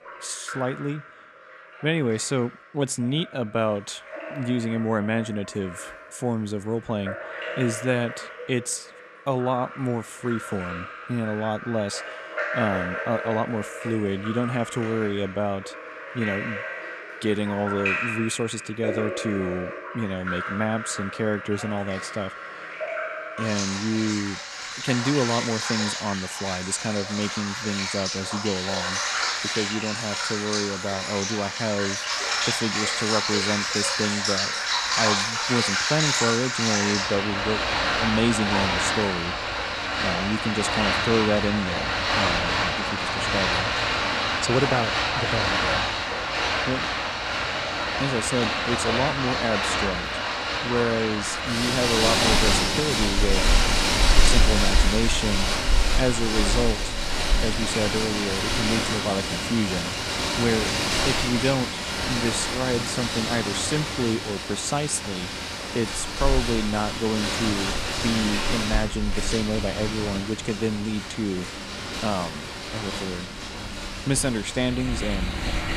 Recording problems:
rain or running water; very loud; throughout; 2 dB above the speech

